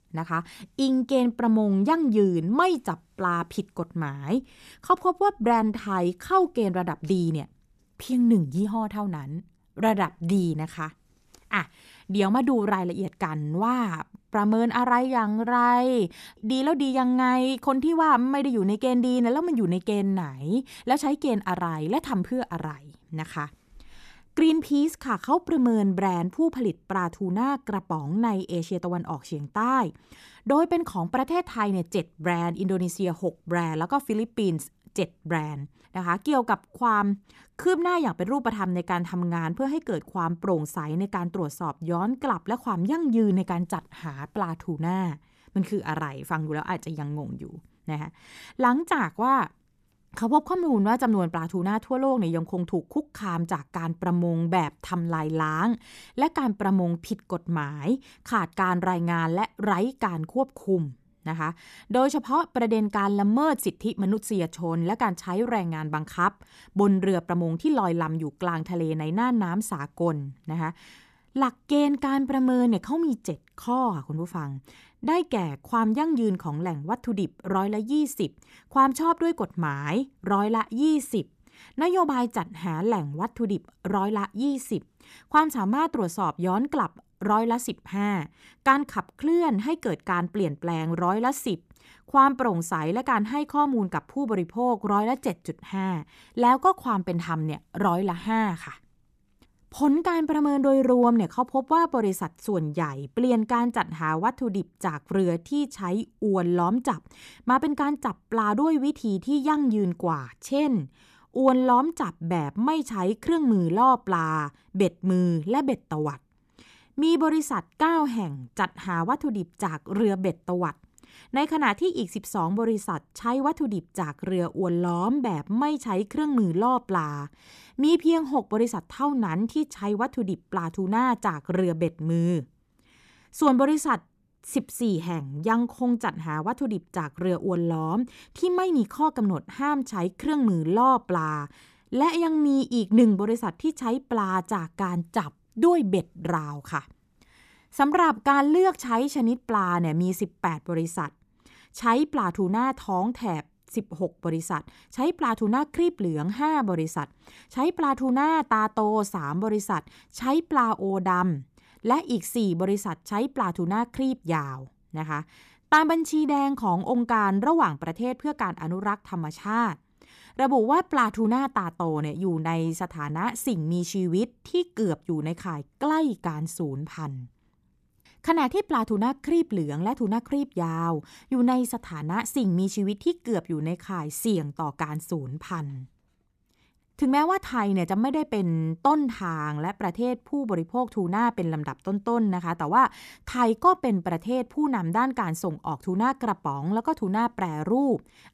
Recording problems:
uneven, jittery; strongly; from 9.5 s to 1:08

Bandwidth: 14.5 kHz